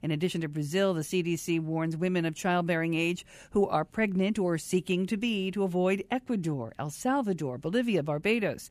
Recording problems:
none

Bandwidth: 14.5 kHz